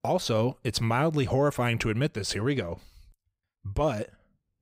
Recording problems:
none

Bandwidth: 15.5 kHz